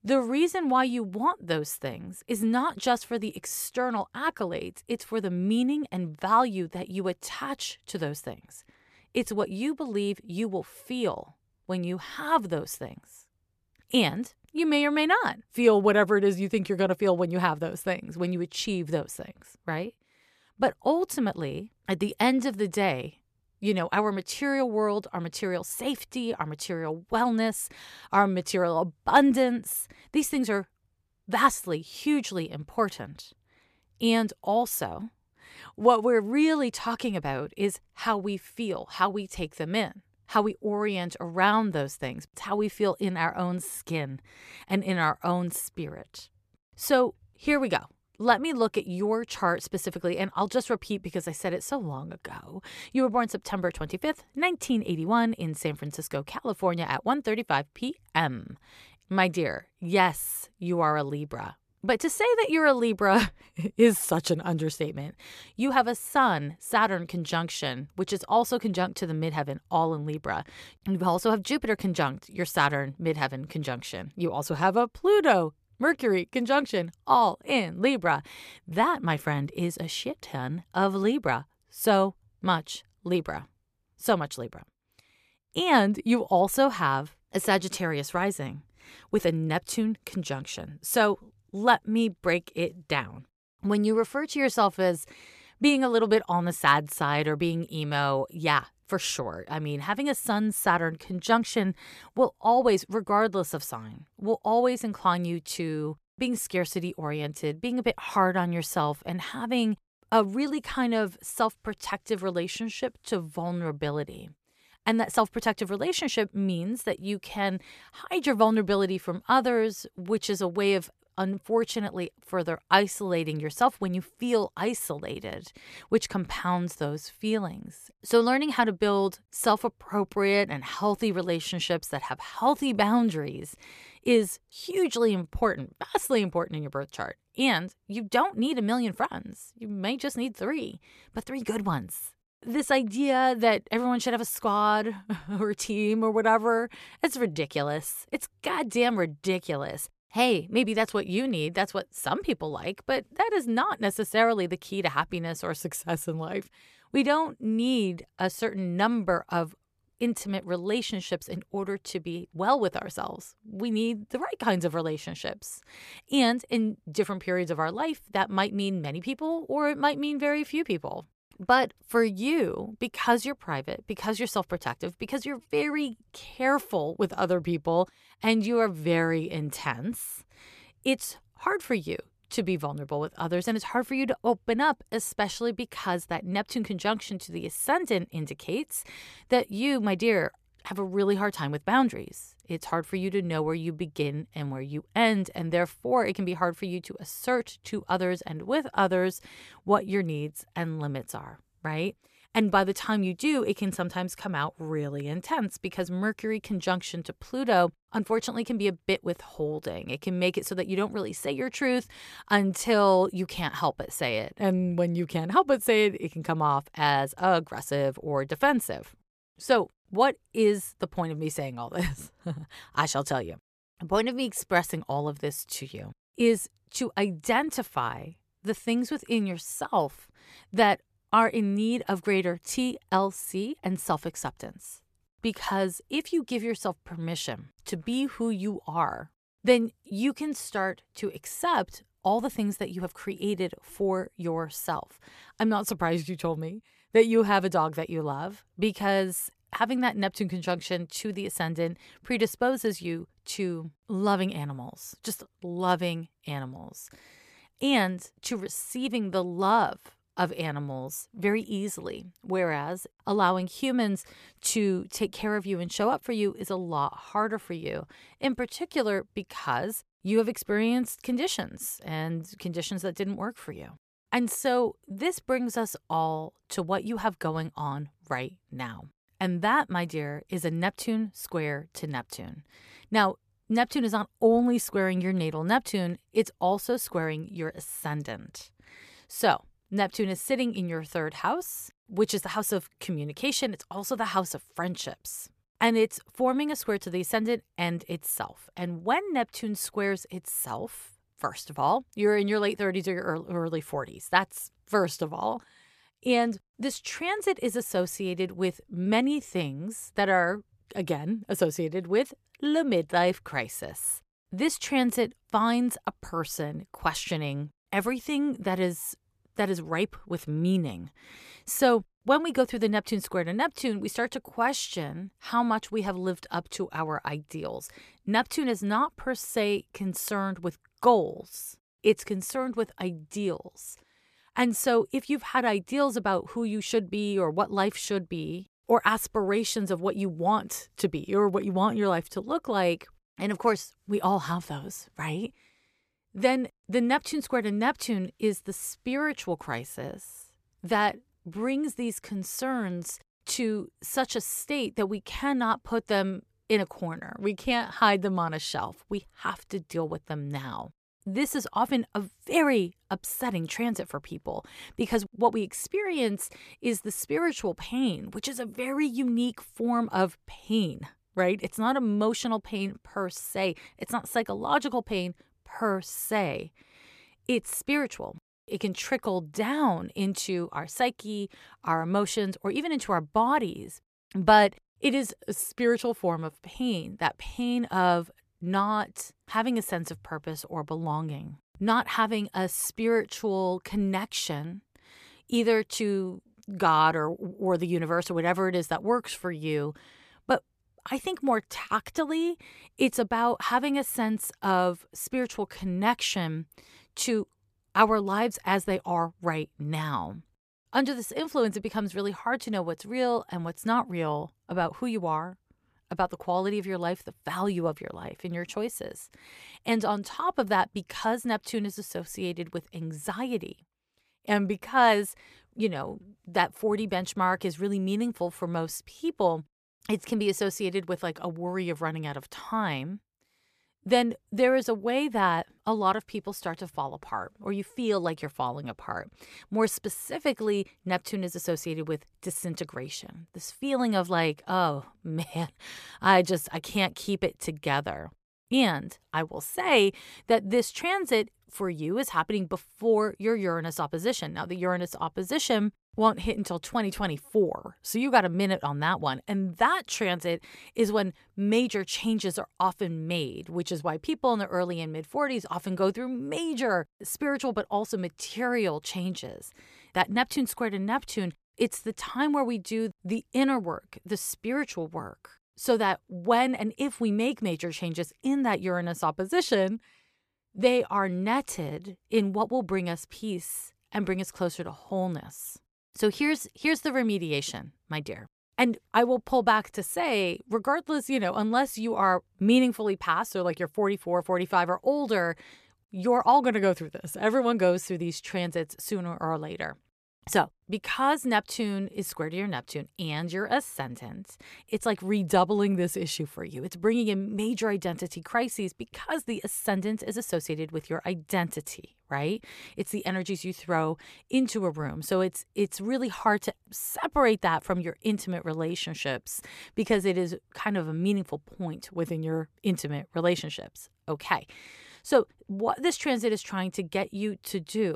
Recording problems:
abrupt cut into speech; at the end

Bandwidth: 14.5 kHz